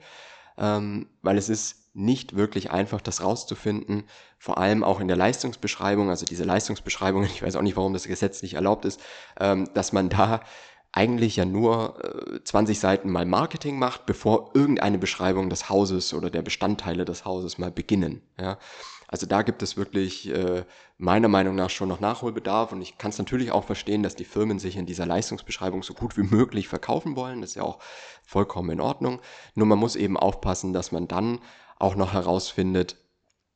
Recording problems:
high frequencies cut off; noticeable; nothing above 8 kHz

